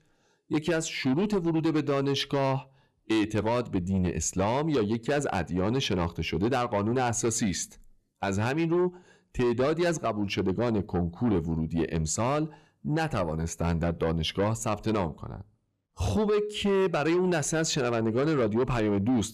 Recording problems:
distortion; slight; 10 dB below the speech

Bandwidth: 14.5 kHz